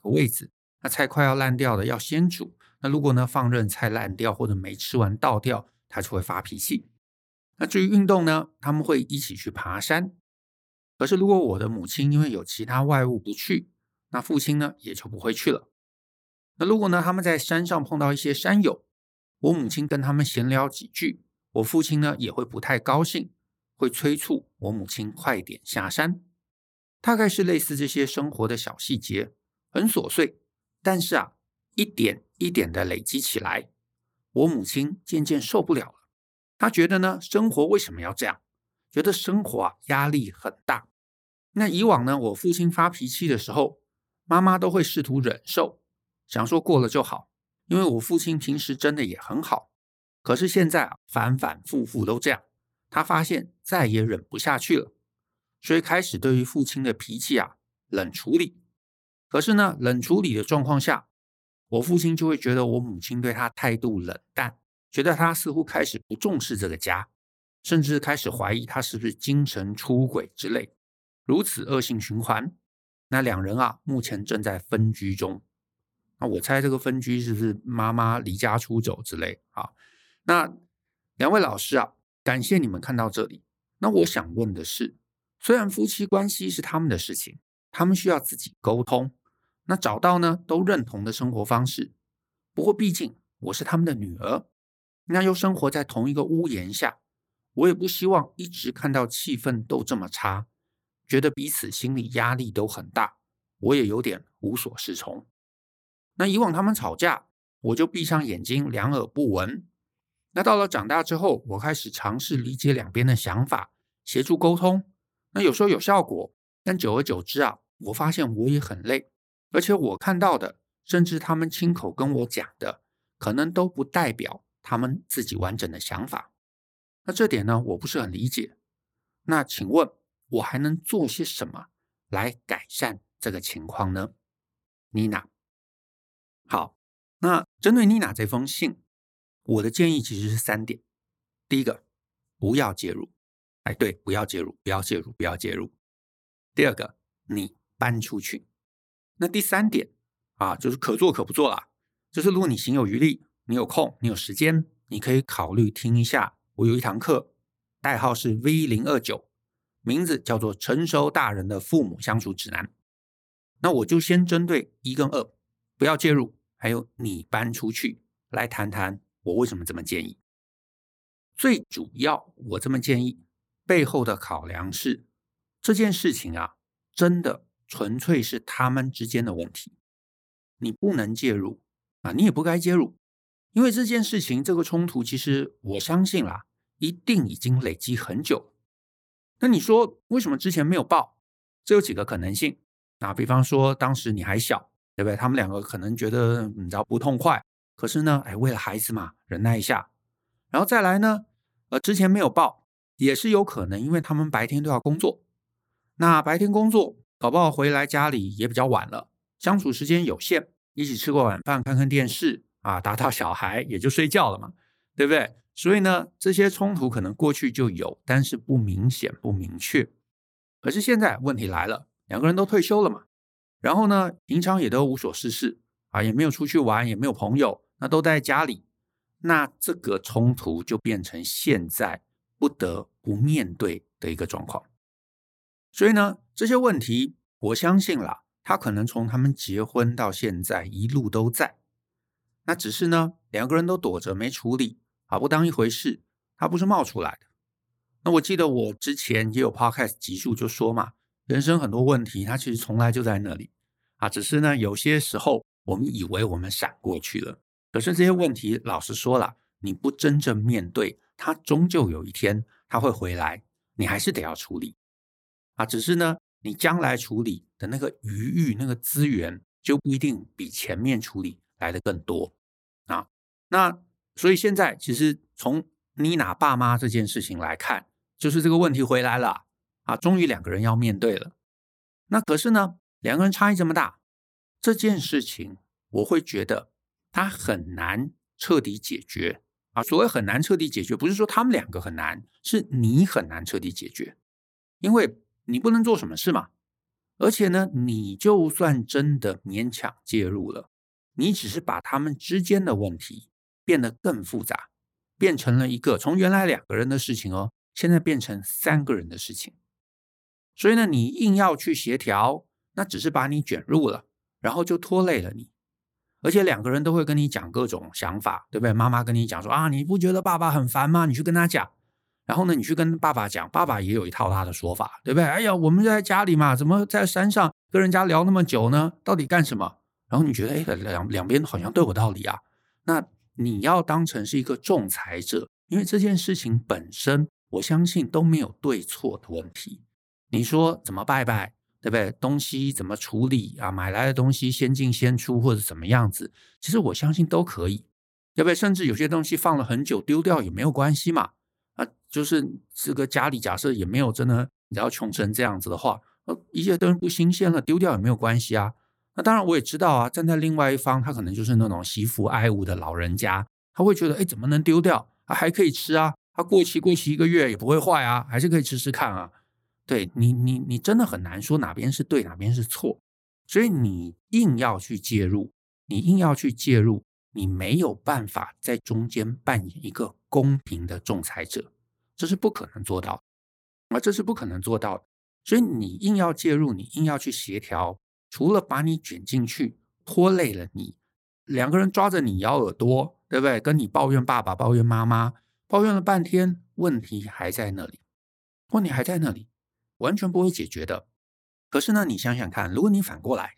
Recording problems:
none

